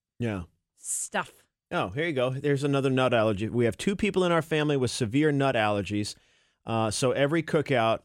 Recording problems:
none

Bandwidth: 16 kHz